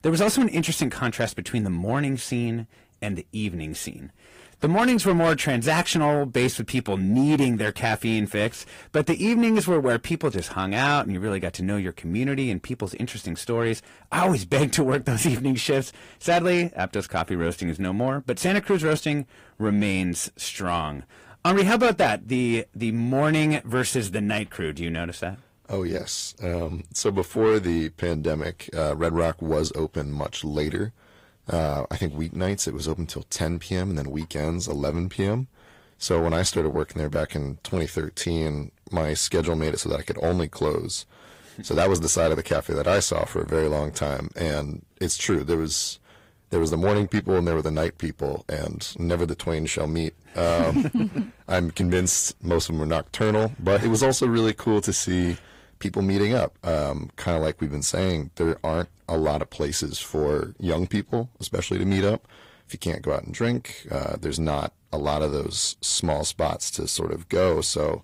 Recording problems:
distortion; slight; 10 dB below the speech
garbled, watery; slightly; nothing above 15.5 kHz

